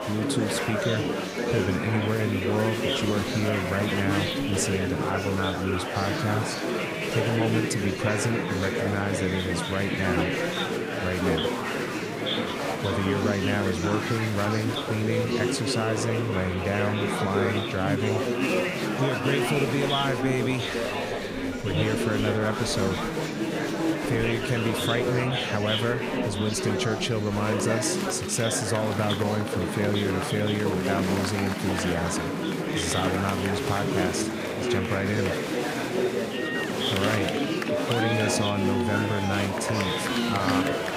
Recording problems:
murmuring crowd; very loud; throughout; 1 dB above the speech

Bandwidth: 15.5 kHz